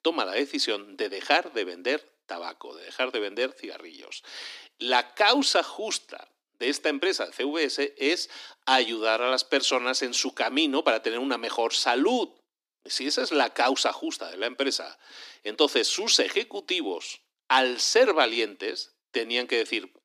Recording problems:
thin; somewhat; fading below 250 Hz

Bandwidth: 15 kHz